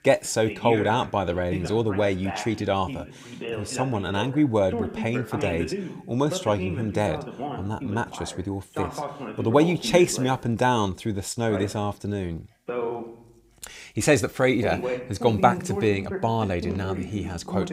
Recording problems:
voice in the background; loud; throughout; 8 dB below the speech

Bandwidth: 15.5 kHz